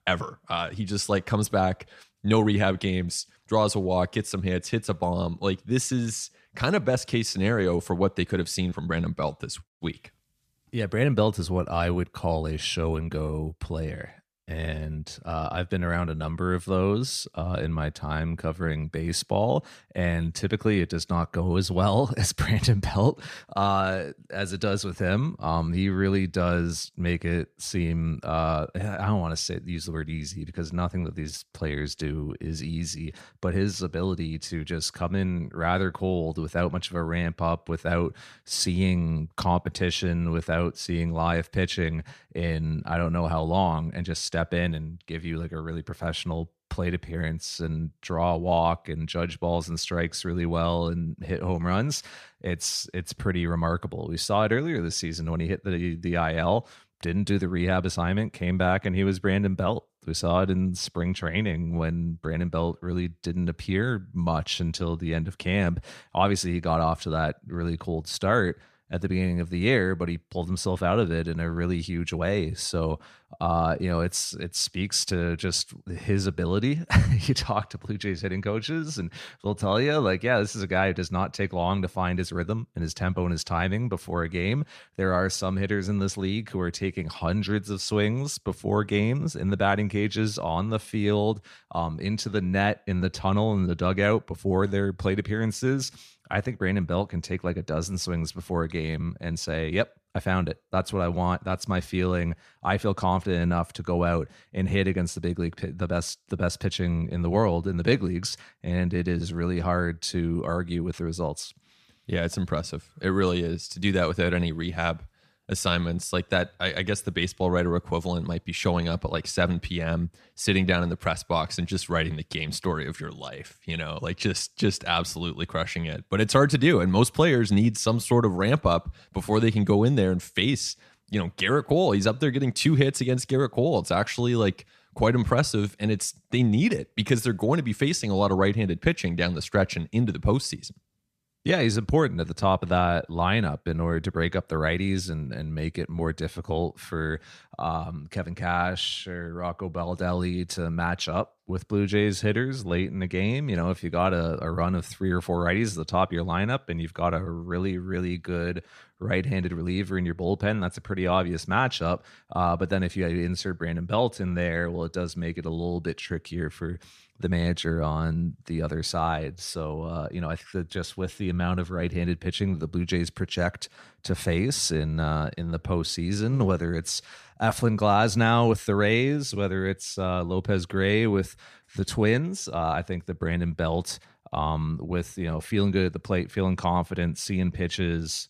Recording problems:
none

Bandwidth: 14.5 kHz